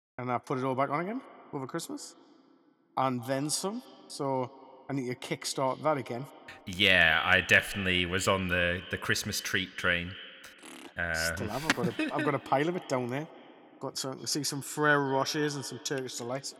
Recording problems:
echo of what is said; noticeable; throughout; 210 ms later, 15 dB below the speech

